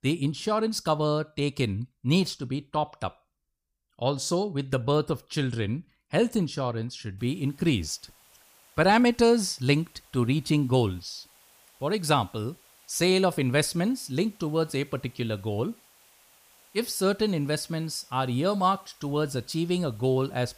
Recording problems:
hiss; faint; from 7 s on; 30 dB below the speech

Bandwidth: 15 kHz